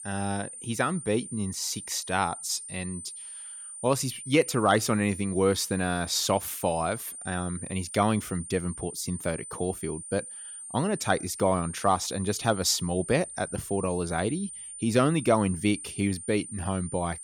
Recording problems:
high-pitched whine; noticeable; throughout; 9 kHz, 10 dB below the speech

